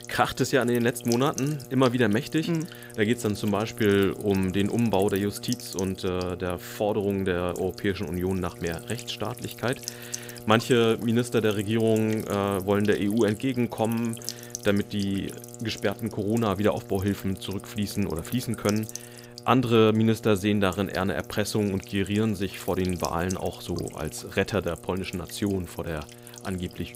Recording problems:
electrical hum; noticeable; throughout; 60 Hz, 15 dB below the speech

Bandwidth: 15.5 kHz